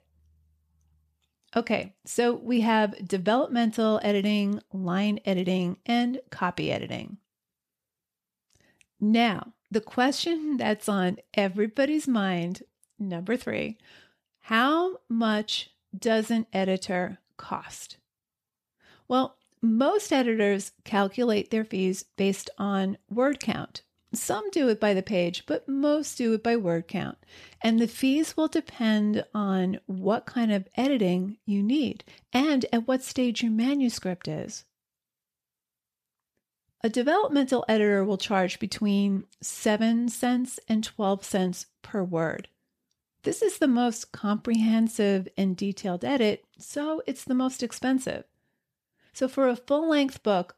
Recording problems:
none

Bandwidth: 14.5 kHz